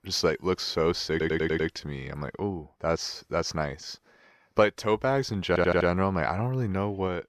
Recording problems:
audio stuttering; at 1 s and at 5.5 s

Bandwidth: 14 kHz